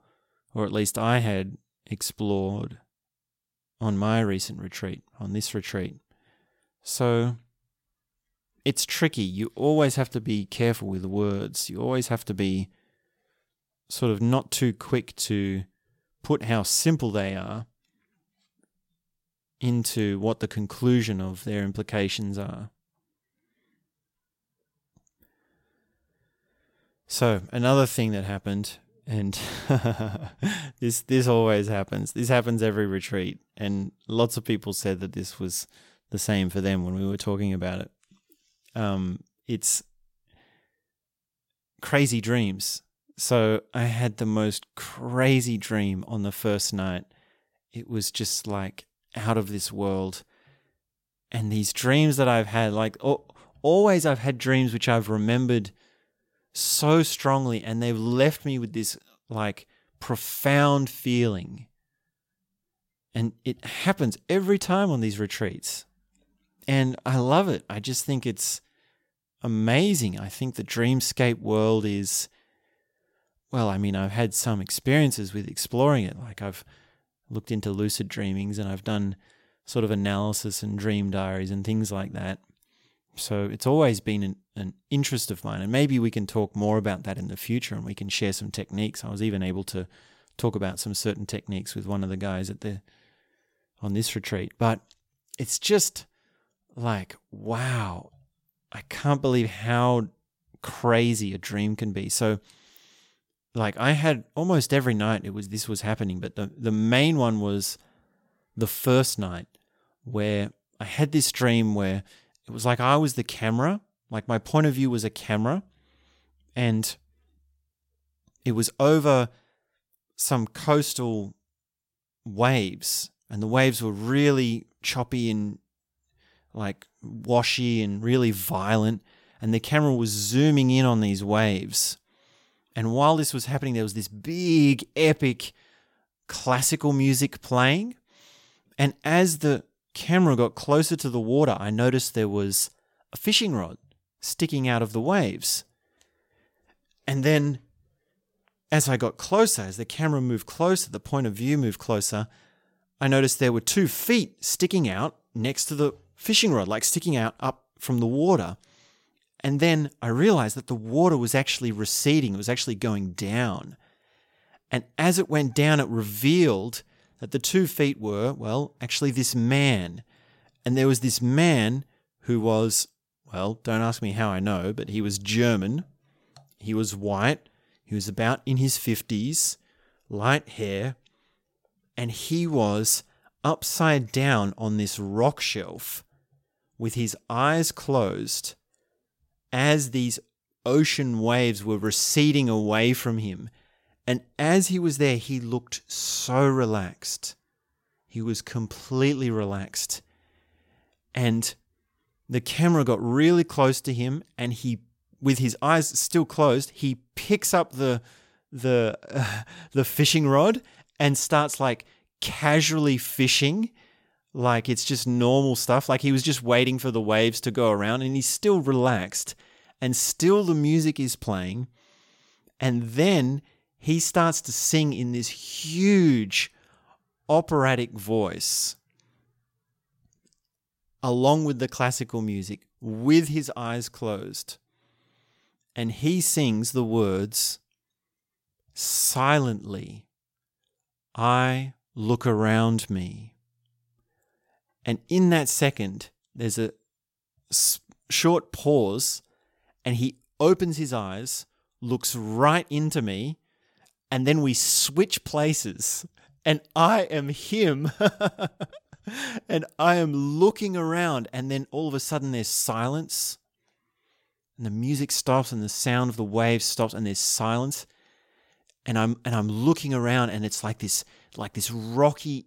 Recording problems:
none

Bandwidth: 16.5 kHz